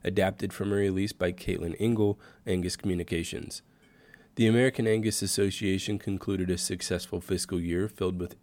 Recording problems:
none

